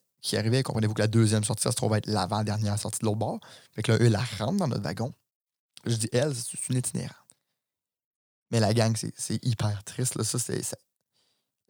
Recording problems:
none

